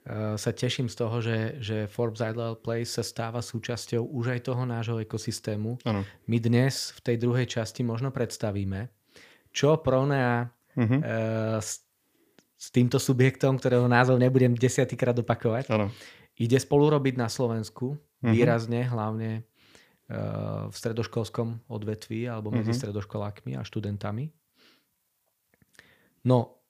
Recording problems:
none

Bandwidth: 15 kHz